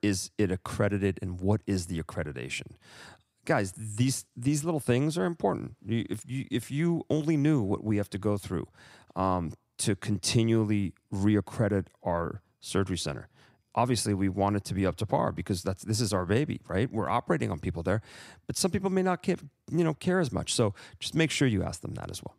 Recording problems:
none

